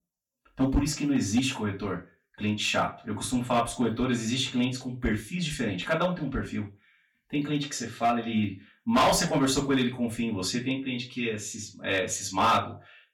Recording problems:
off-mic speech; far
room echo; slight; dies away in 0.2 s
distortion; slight; 2% of the sound clipped

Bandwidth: 18 kHz